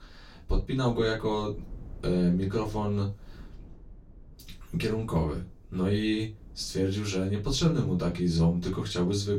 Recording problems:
off-mic speech; far
room echo; very slight; dies away in 0.2 s
low rumble; faint; throughout; 25 dB below the speech

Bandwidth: 16.5 kHz